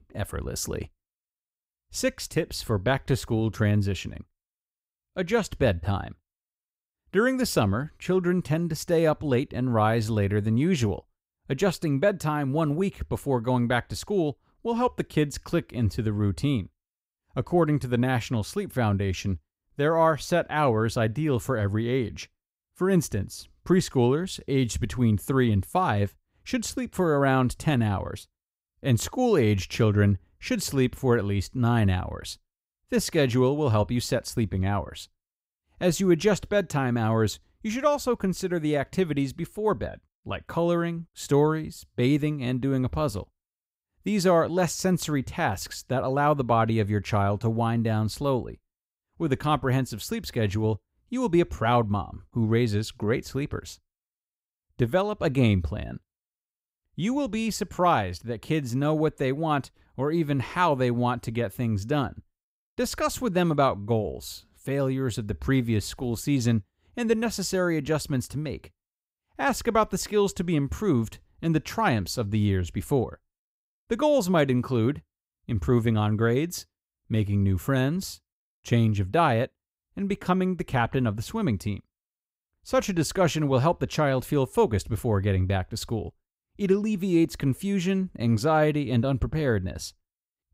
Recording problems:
none

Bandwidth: 15.5 kHz